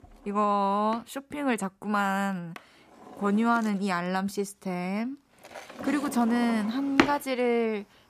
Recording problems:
household noises; loud; throughout; 6 dB below the speech

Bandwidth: 14.5 kHz